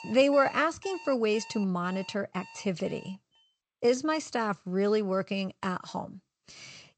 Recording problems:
garbled, watery; slightly; nothing above 8 kHz
alarms or sirens; noticeable; until 3 s; 20 dB below the speech

